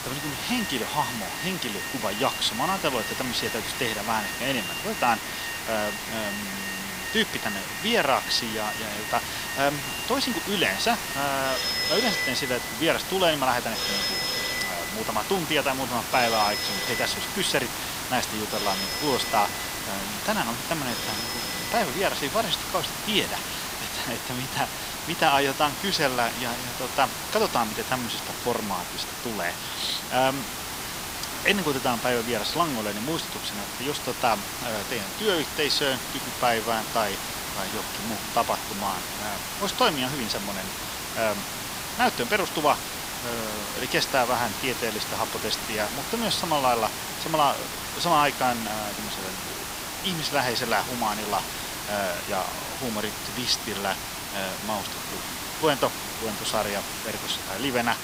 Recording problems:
thin; somewhat; fading below 400 Hz
alarms or sirens; loud; throughout; 5 dB below the speech
hiss; loud; throughout; 4 dB below the speech

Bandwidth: 15.5 kHz